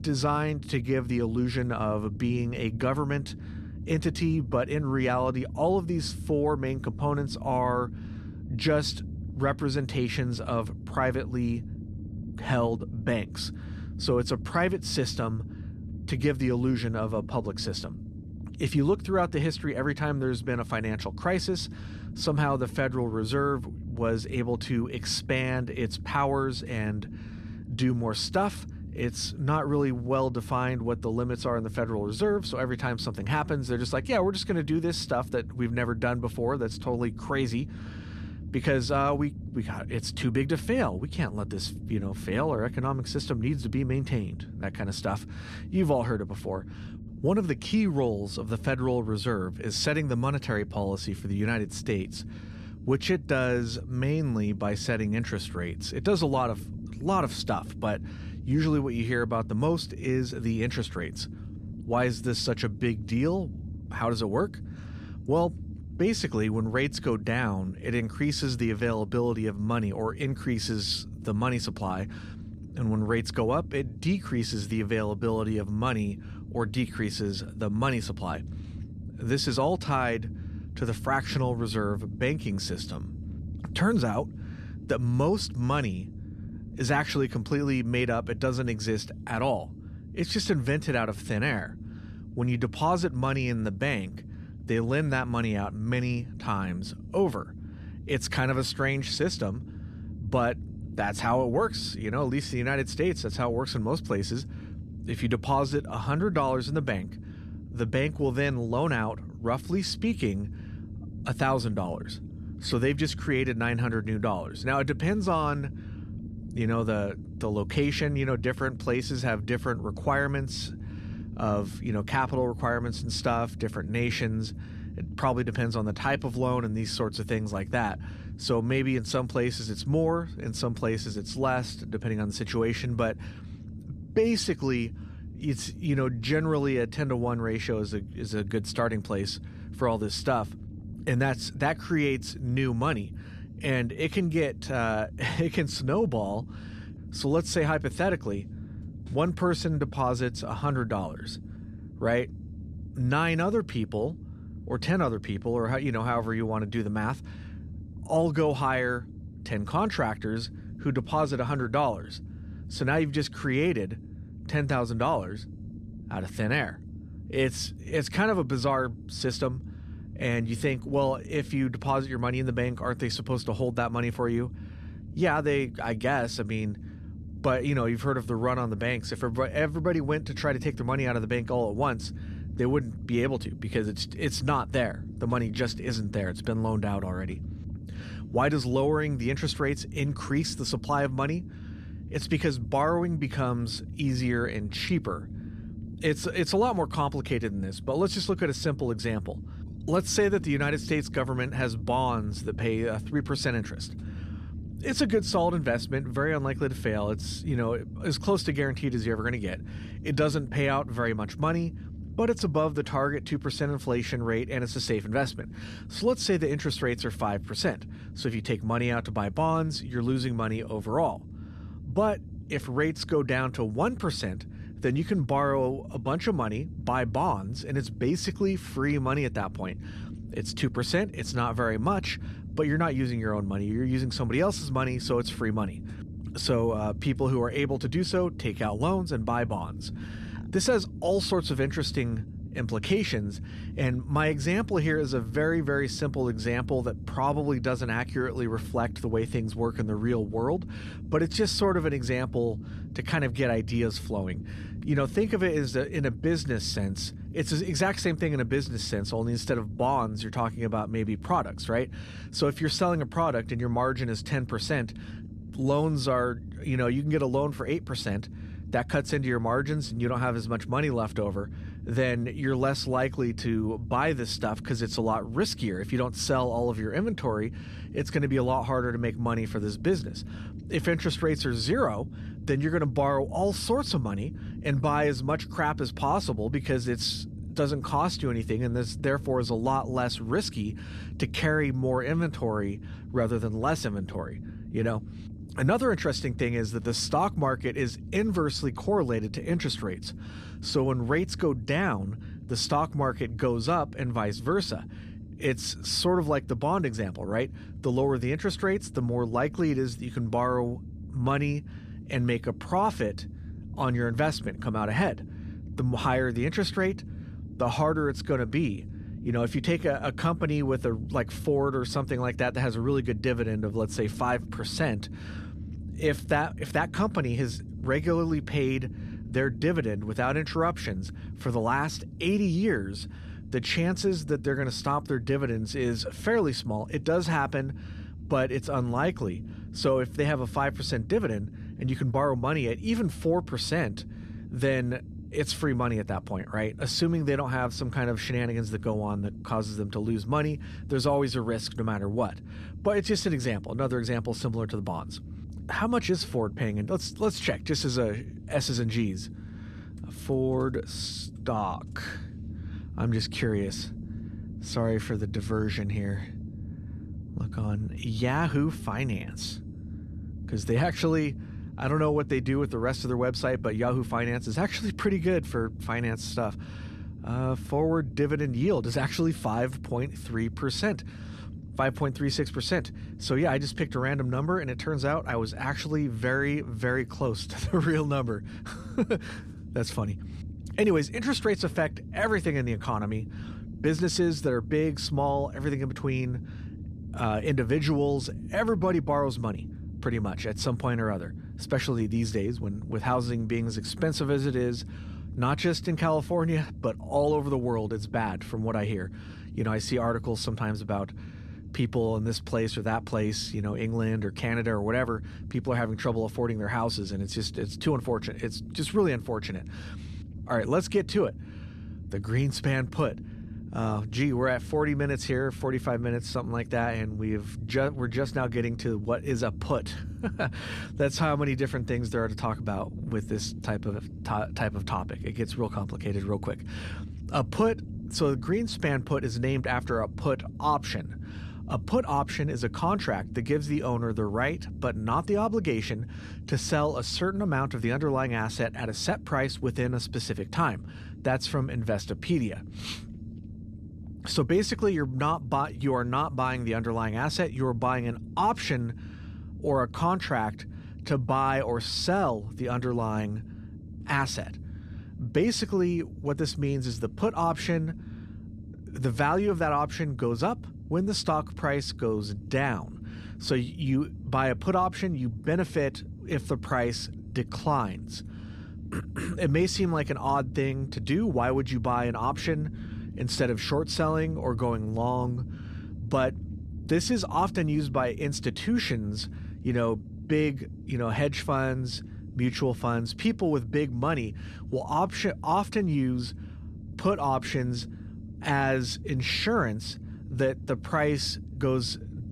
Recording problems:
low rumble; faint; throughout; 20 dB below the speech

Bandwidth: 14.5 kHz